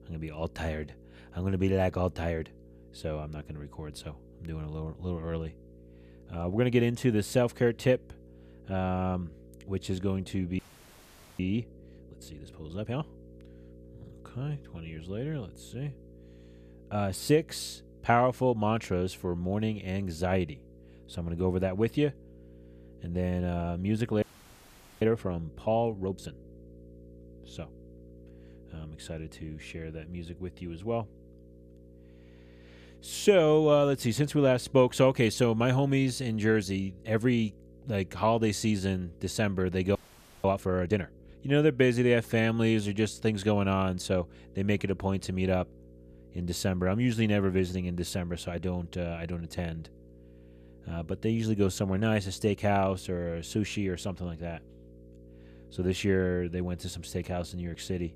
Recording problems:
electrical hum; faint; throughout; 60 Hz, 25 dB below the speech
audio freezing; at 11 s for 1 s, at 24 s for 1 s and at 40 s

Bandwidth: 14.5 kHz